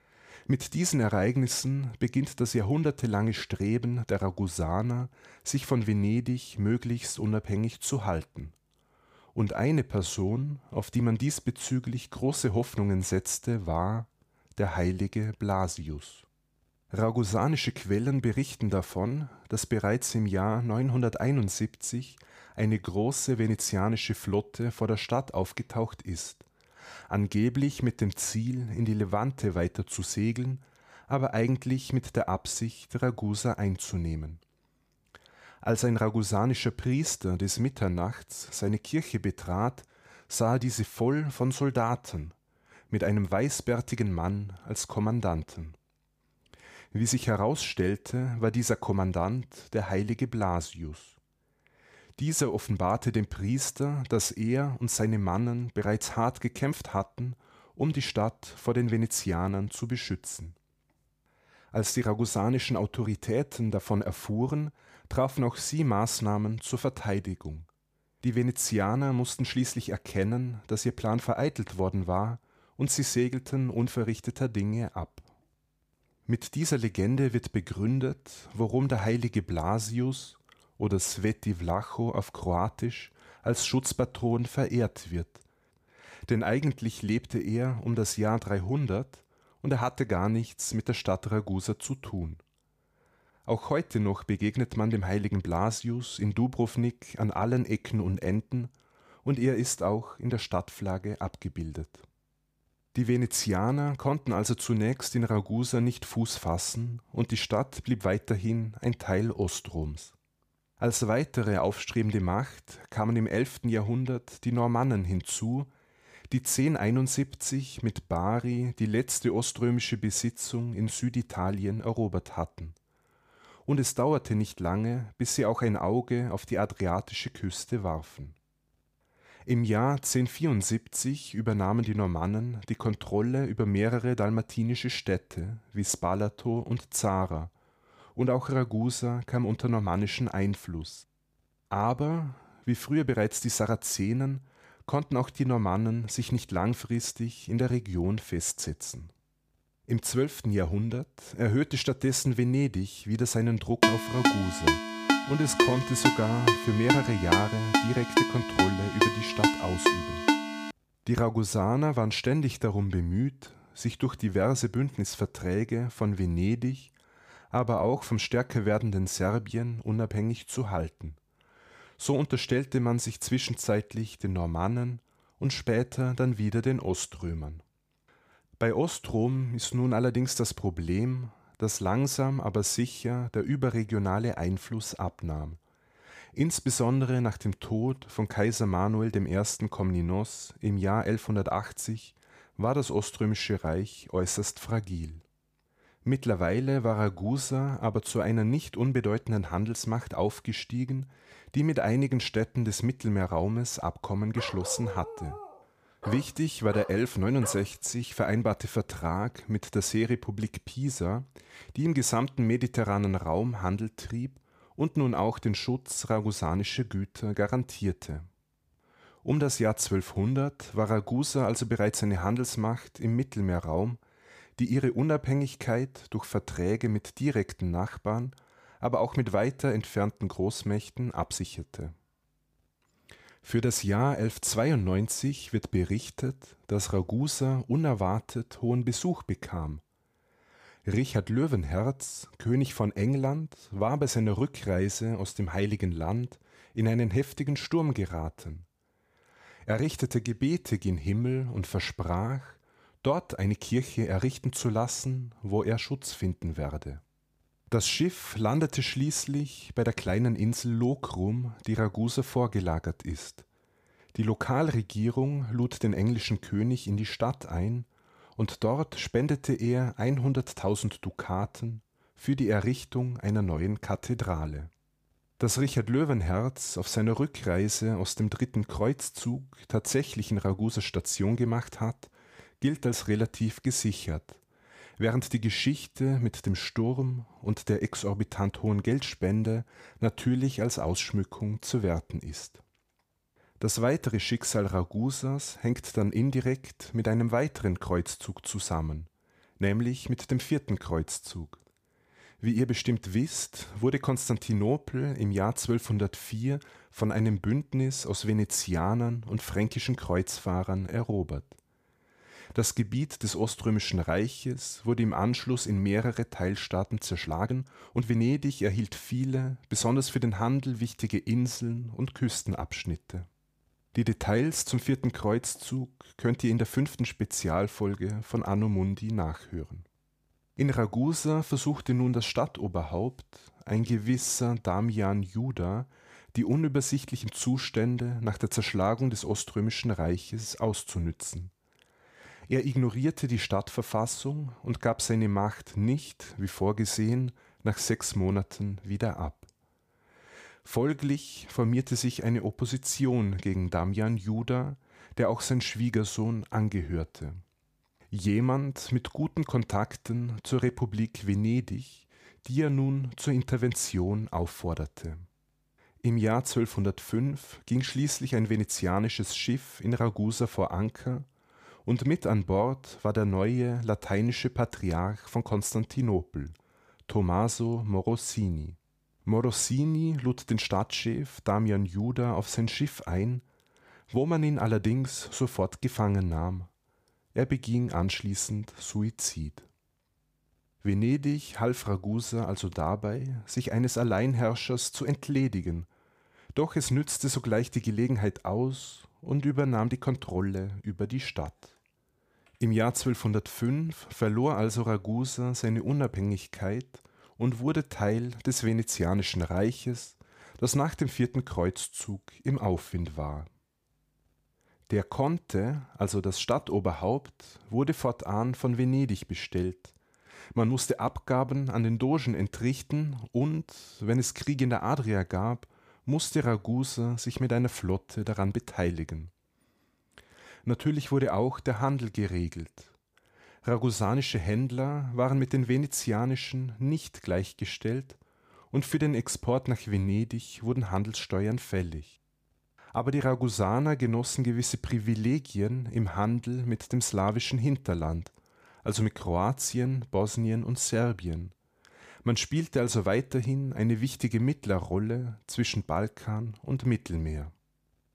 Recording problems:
phone ringing; loud; from 2:34 to 2:40; peak 5 dB above the speech
uneven, jittery; strongly; from 2:35 to 6:40
dog barking; noticeable; from 3:24 to 3:28; peak 9 dB below the speech

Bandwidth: 15 kHz